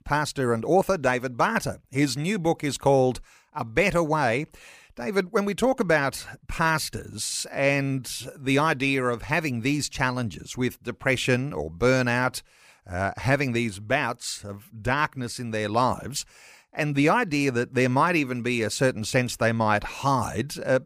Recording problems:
none

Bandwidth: 15 kHz